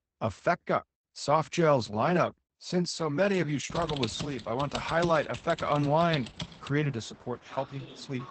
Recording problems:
garbled, watery; badly; nothing above 8 kHz
train or aircraft noise; faint; from 4.5 s on; 25 dB below the speech
keyboard typing; noticeable; from 3.5 to 6.5 s; peak 7 dB below the speech

